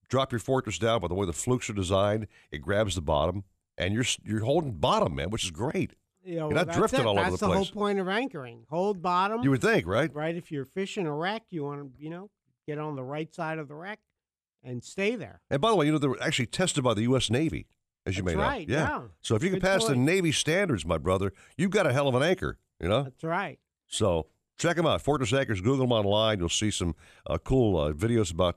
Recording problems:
none

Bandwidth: 14.5 kHz